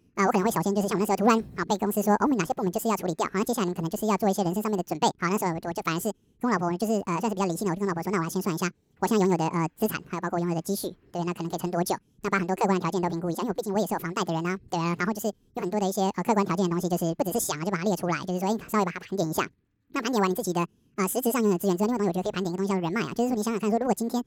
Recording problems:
wrong speed and pitch; too fast and too high; 1.7 times normal speed

